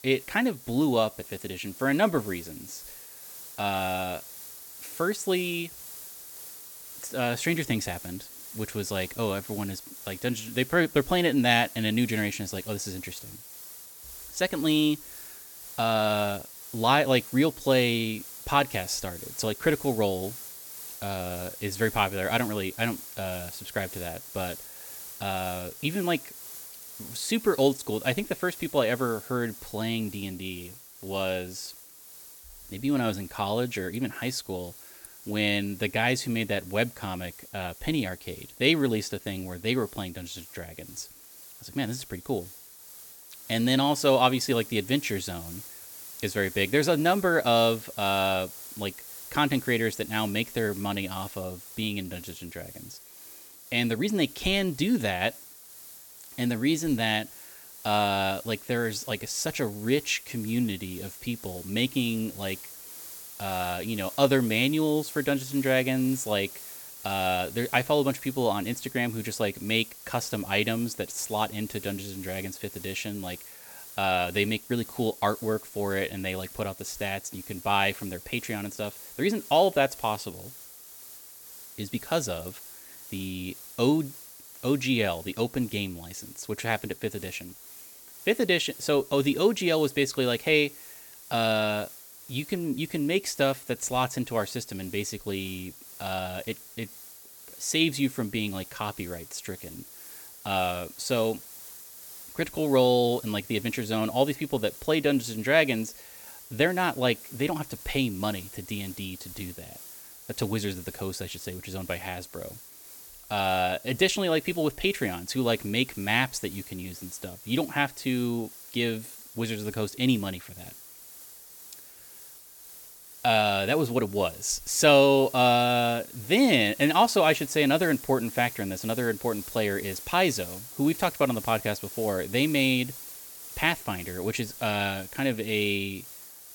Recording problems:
hiss; noticeable; throughout; 15 dB below the speech

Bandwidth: 17.5 kHz